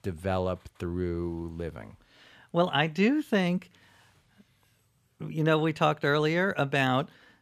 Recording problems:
none

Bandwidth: 14.5 kHz